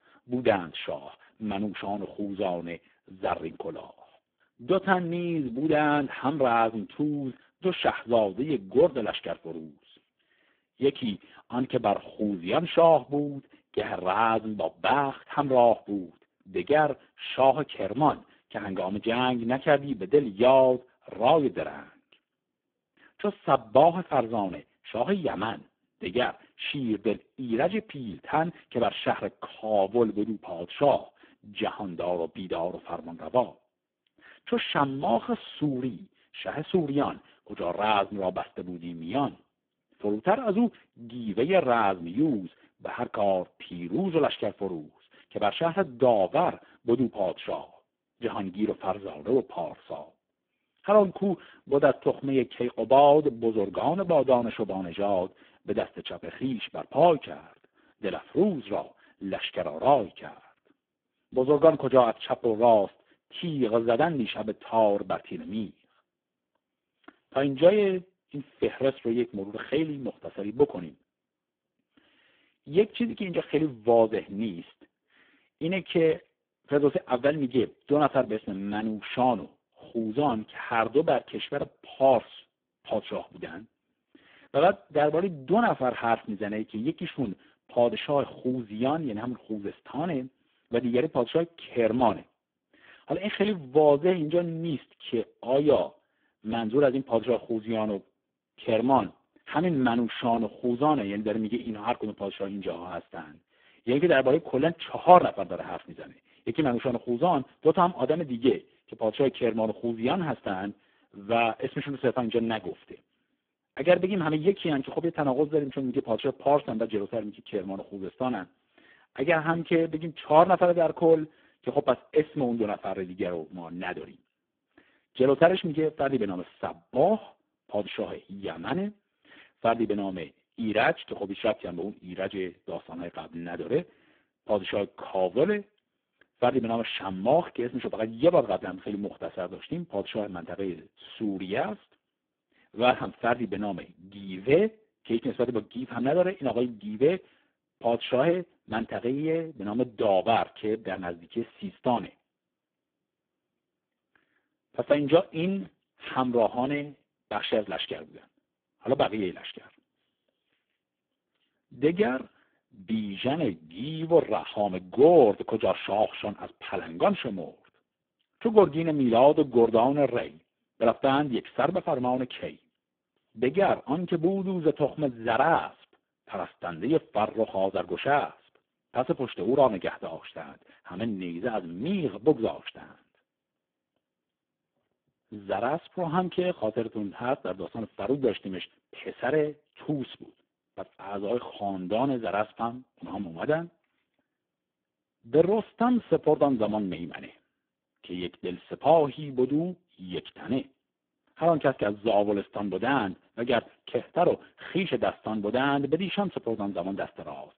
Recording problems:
phone-call audio; poor line

